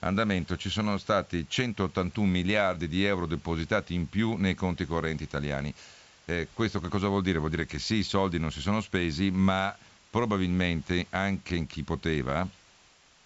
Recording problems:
high frequencies cut off; noticeable; nothing above 8 kHz
hiss; faint; throughout; 25 dB below the speech

